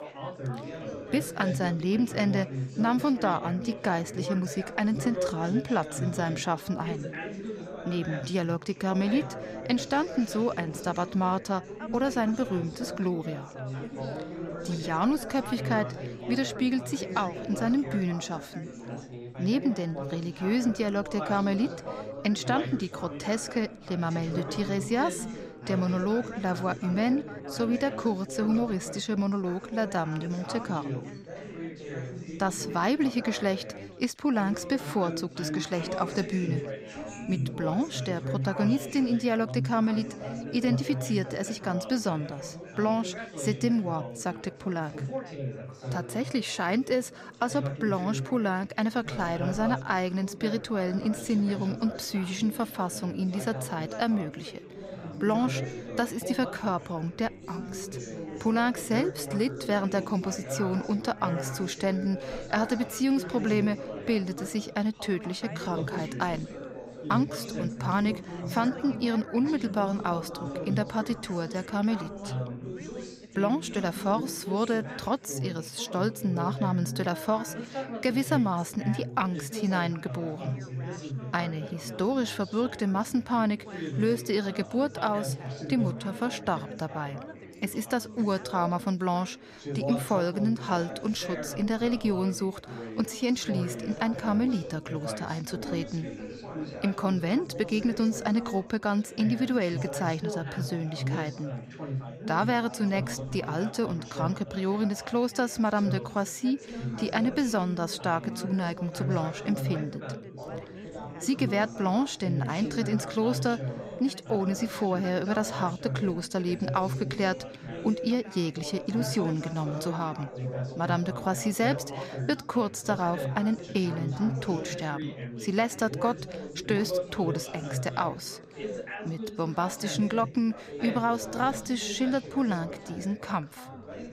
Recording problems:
background chatter; loud; throughout; 4 voices, 8 dB below the speech

